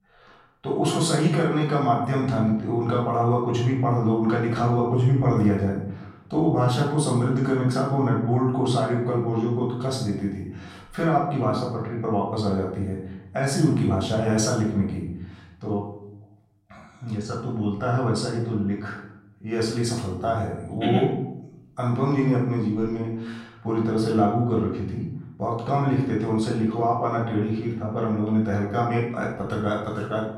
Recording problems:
off-mic speech; far
room echo; noticeable; dies away in 0.7 s

